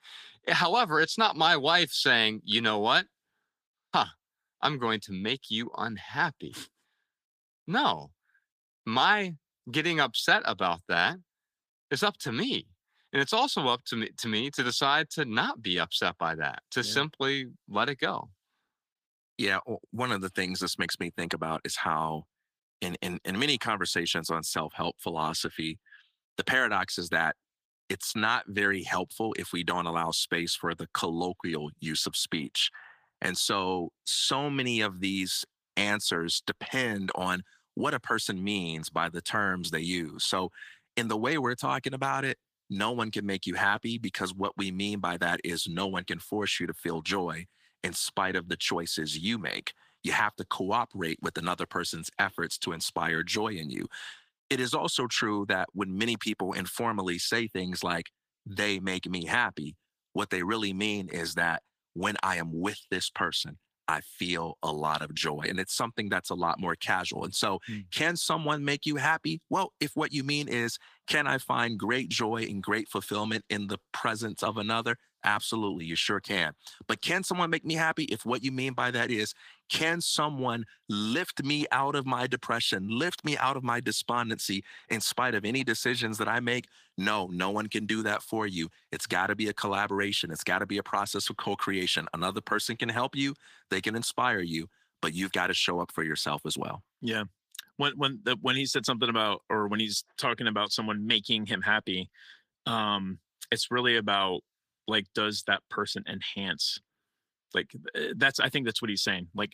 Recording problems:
thin; somewhat; fading below 1 kHz
garbled, watery; slightly; nothing above 15 kHz

